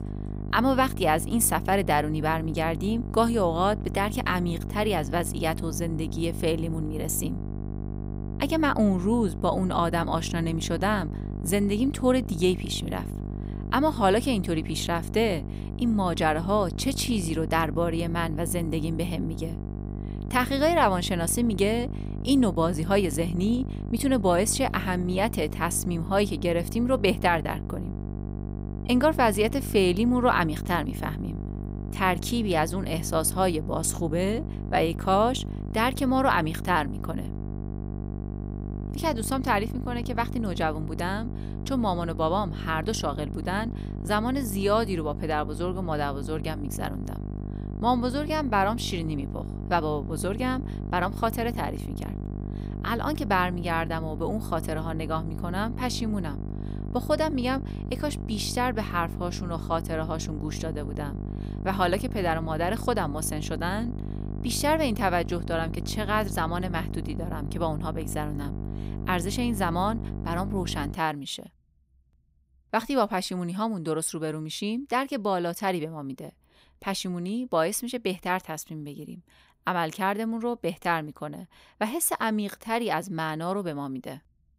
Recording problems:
electrical hum; noticeable; until 1:11; 50 Hz, 15 dB below the speech

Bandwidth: 15.5 kHz